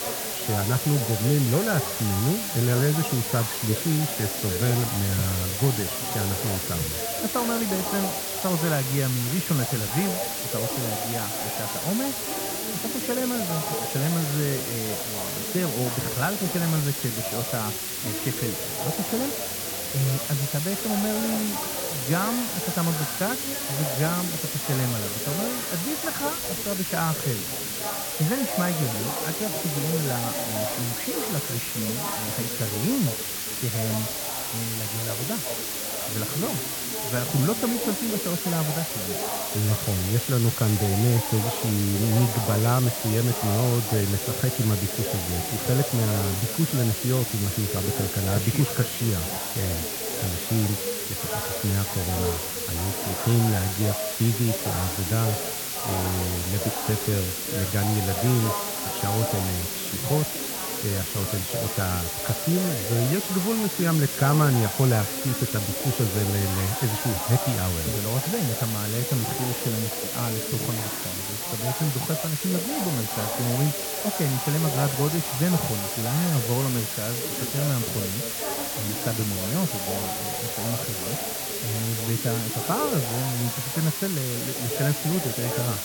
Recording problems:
muffled; very; fading above 1.5 kHz
background chatter; loud; throughout; 4 voices, 8 dB below the speech
hiss; loud; throughout; 1 dB below the speech

